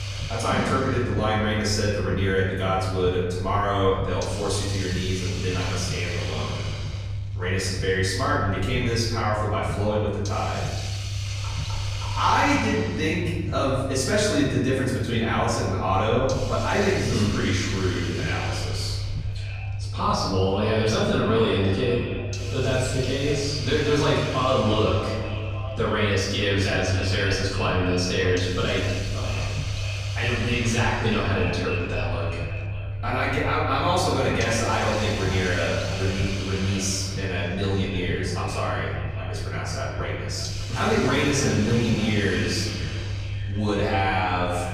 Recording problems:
off-mic speech; far
echo of what is said; noticeable; from 19 s on; 590 ms later, 15 dB below the speech
room echo; noticeable; dies away in 1.3 s
hiss; noticeable; throughout; 10 dB below the speech
low rumble; faint; throughout; 20 dB below the speech

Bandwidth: 15 kHz